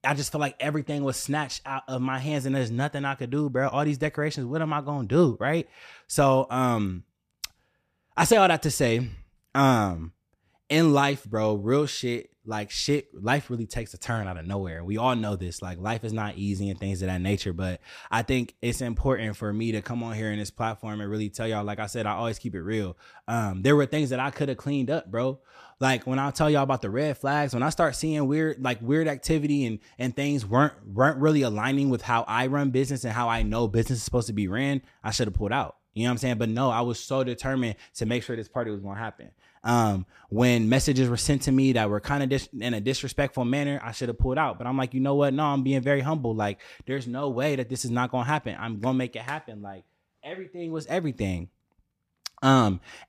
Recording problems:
none

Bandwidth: 14.5 kHz